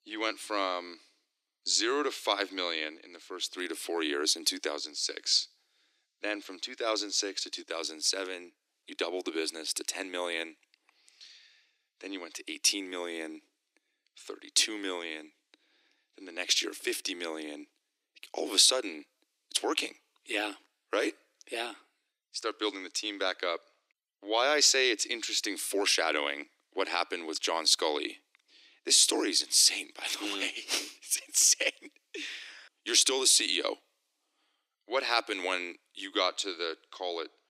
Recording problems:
thin; very; fading below 300 Hz

